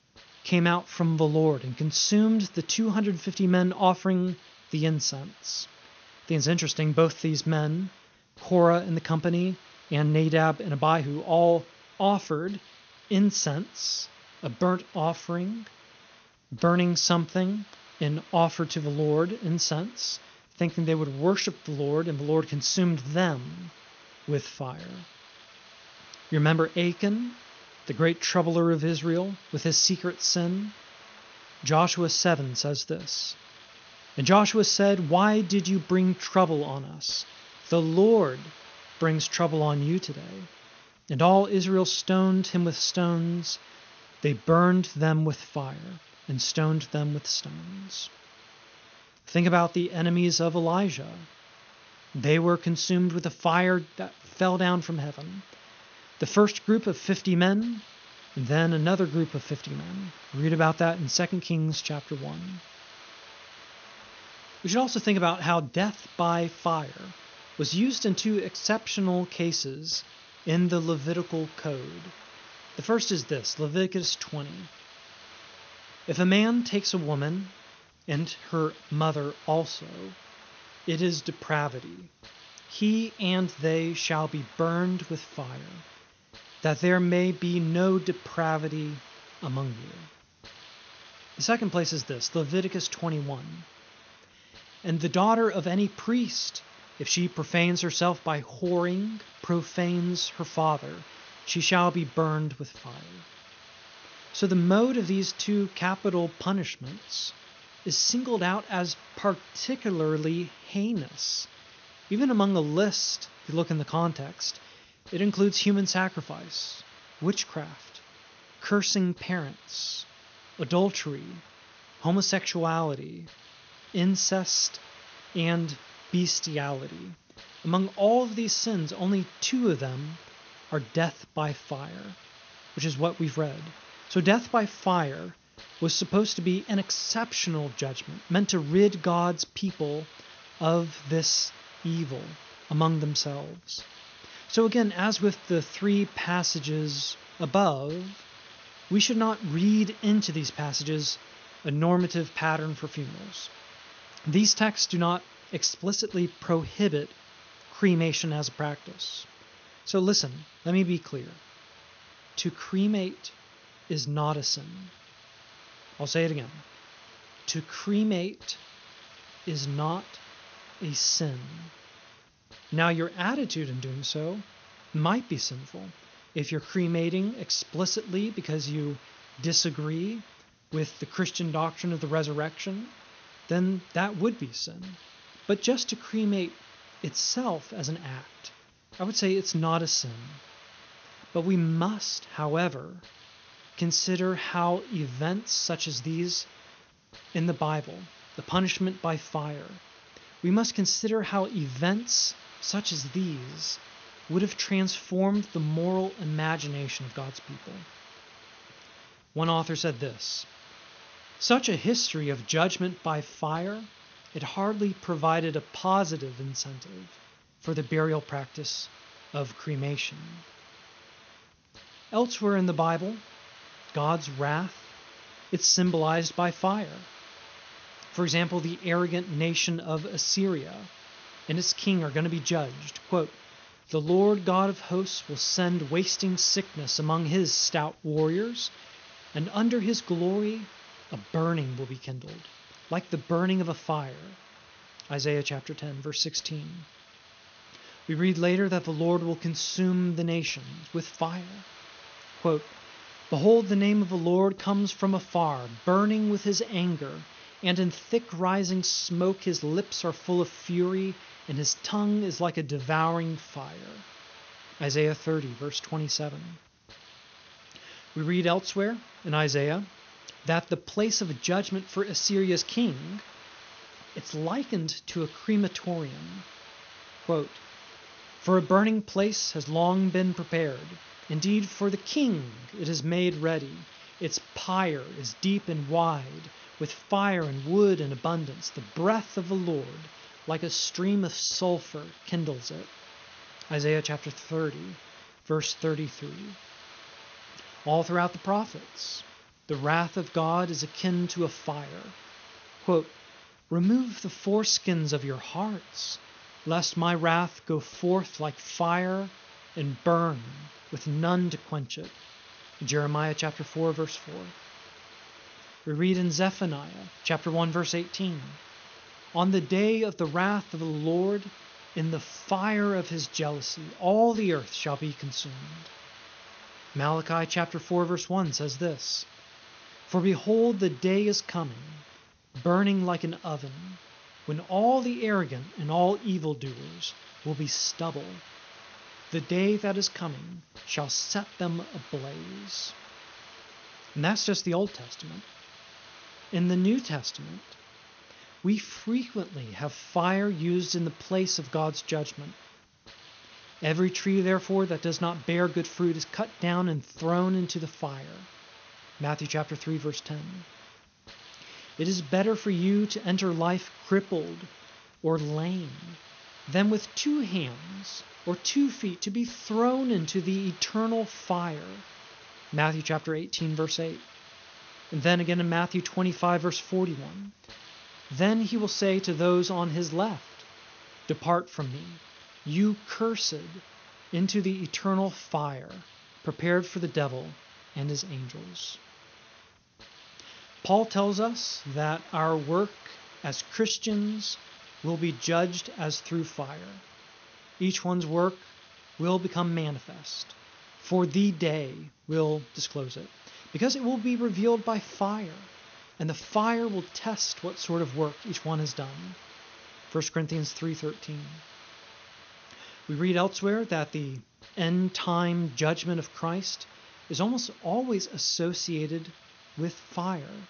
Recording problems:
high frequencies cut off; noticeable; nothing above 6.5 kHz
hiss; faint; throughout; 20 dB below the speech

